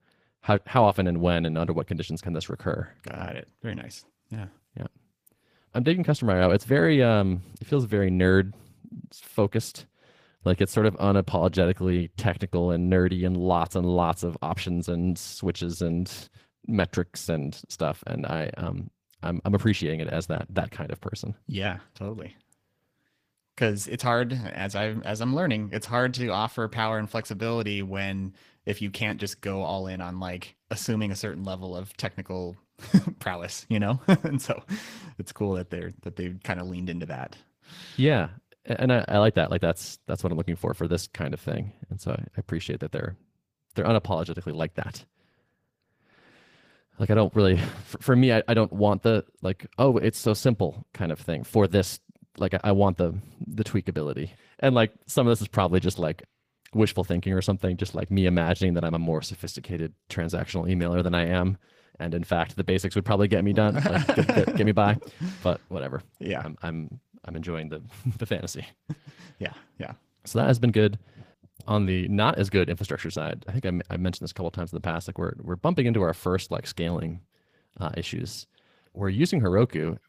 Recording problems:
garbled, watery; slightly; nothing above 15 kHz

